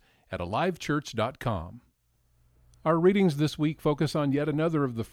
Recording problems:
none

